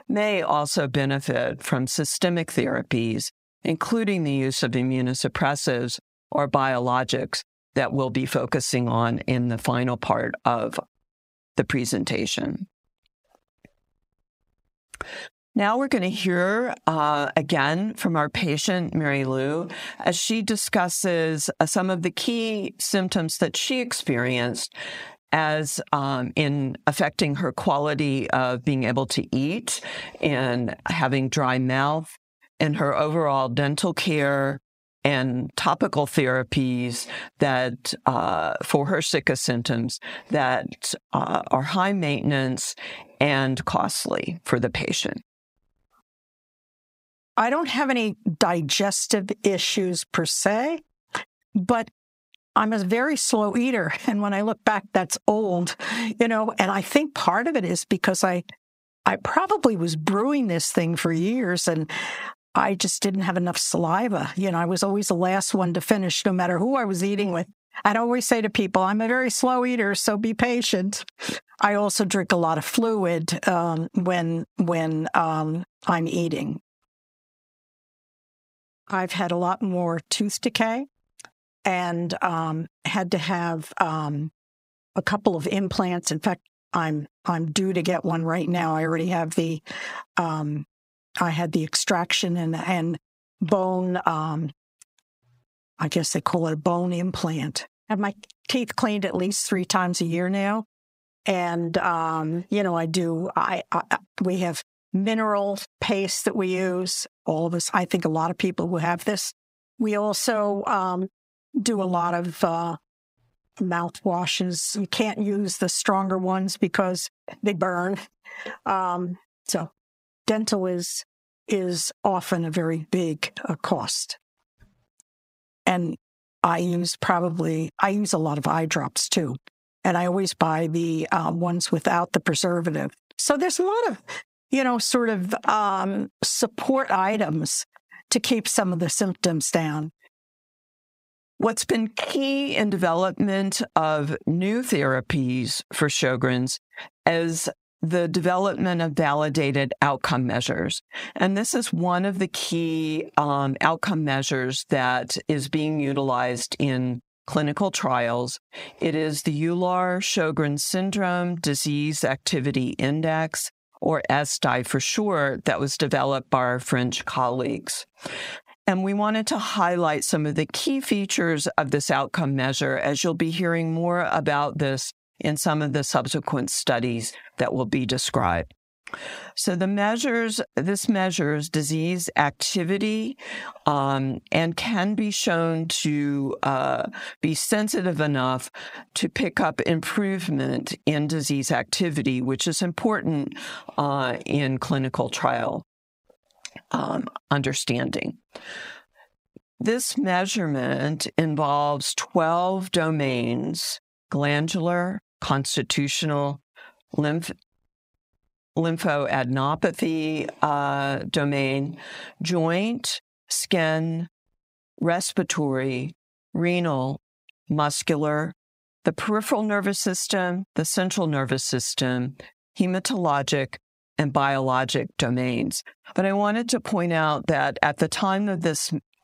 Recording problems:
squashed, flat; heavily

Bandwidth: 15.5 kHz